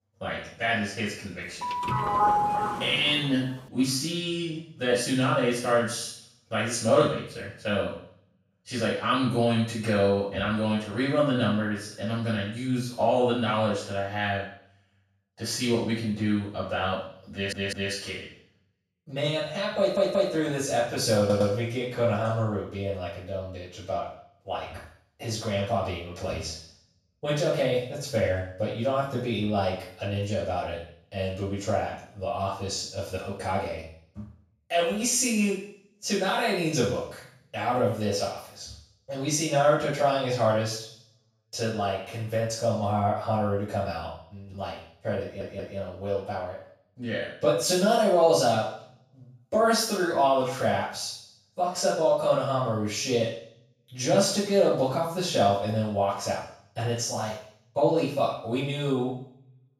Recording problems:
off-mic speech; far
room echo; noticeable; dies away in 0.6 s
doorbell; loud; from 1.5 to 3 s; peak 4 dB above the speech
audio stuttering; 4 times, first at 17 s

